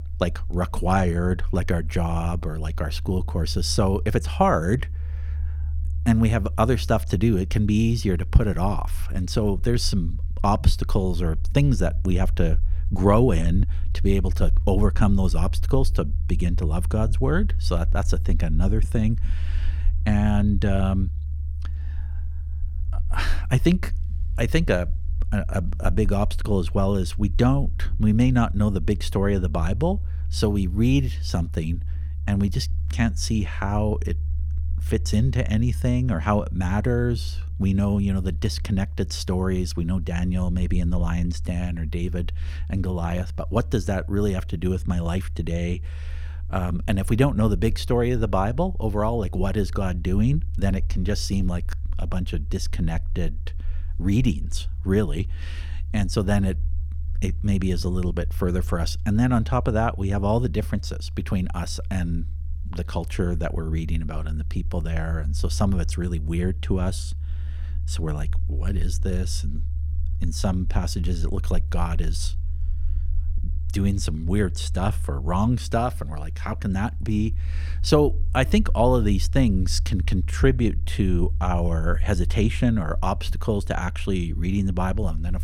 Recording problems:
low rumble; faint; throughout; 20 dB below the speech

